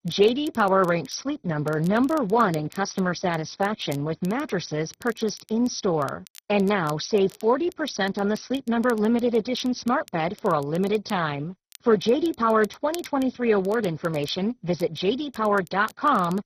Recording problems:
garbled, watery; badly; nothing above 6 kHz
crackle, like an old record; faint; 25 dB below the speech

